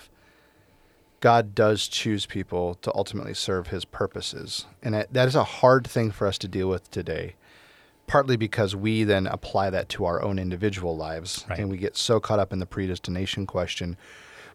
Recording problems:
none

